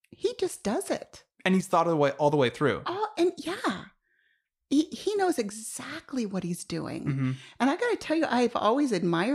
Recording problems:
abrupt cut into speech; at the end

